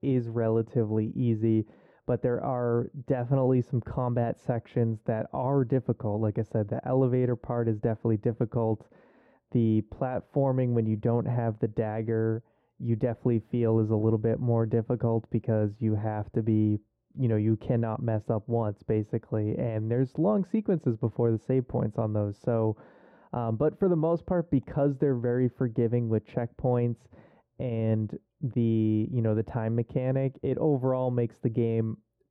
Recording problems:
muffled; very; fading above 1.5 kHz

